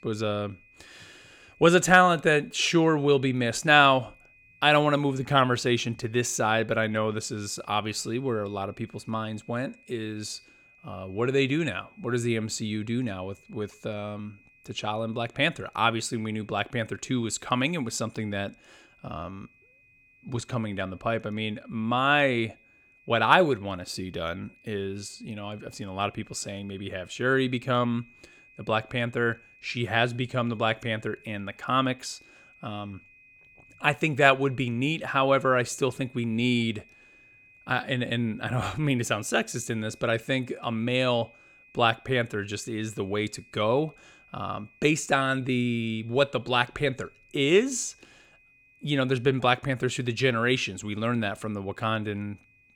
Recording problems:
high-pitched whine; faint; throughout; 2.5 kHz, 30 dB below the speech

